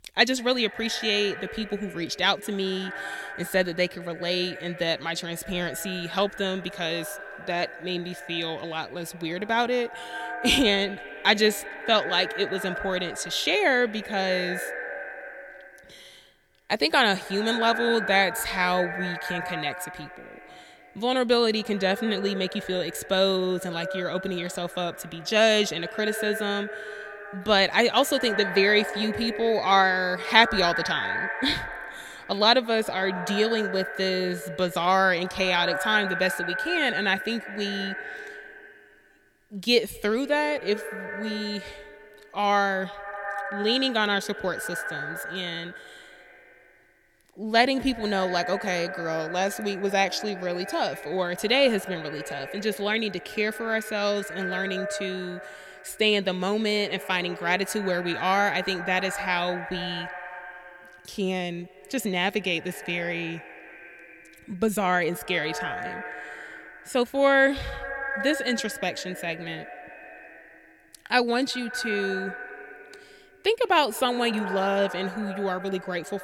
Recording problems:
echo of what is said; strong; throughout; 190 ms later, 10 dB below the speech

